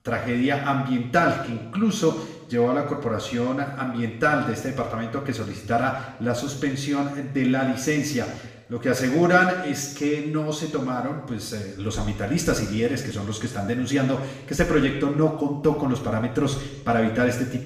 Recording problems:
off-mic speech; far
room echo; noticeable; dies away in 0.9 s

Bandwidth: 15 kHz